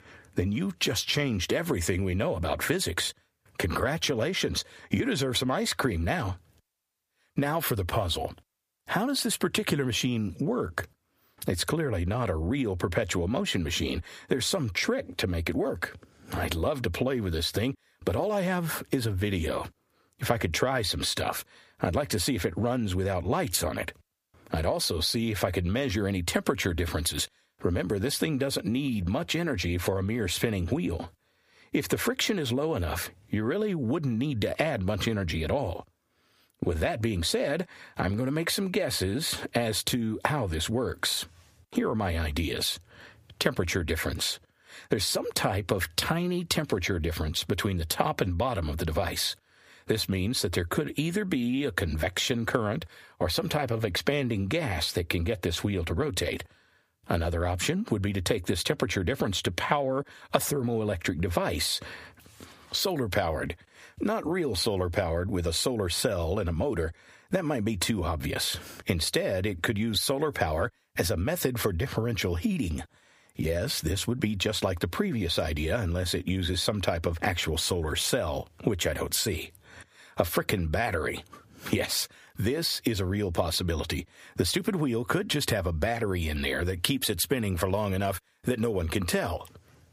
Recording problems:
squashed, flat; heavily

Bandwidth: 15 kHz